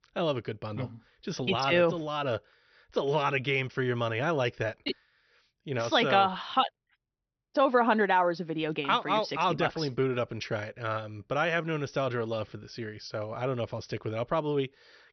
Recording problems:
high frequencies cut off; noticeable; nothing above 6 kHz

